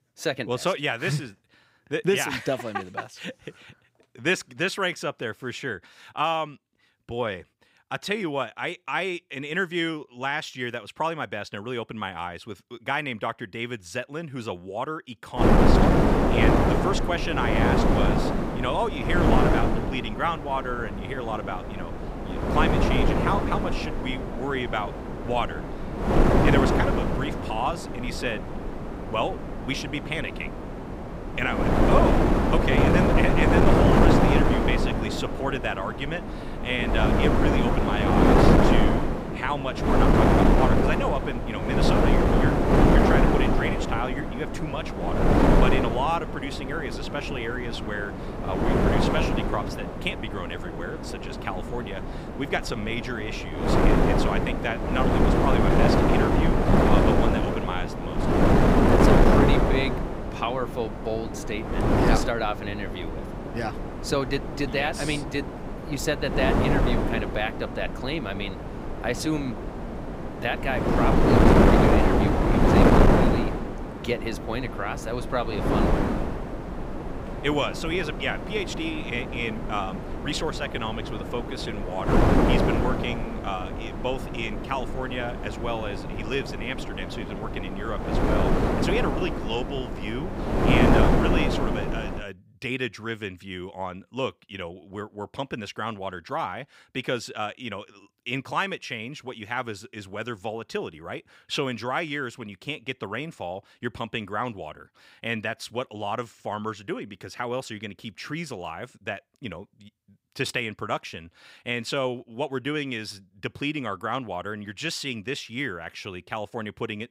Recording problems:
wind noise on the microphone; heavy; from 15 s to 1:32; 4 dB above the speech

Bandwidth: 15.5 kHz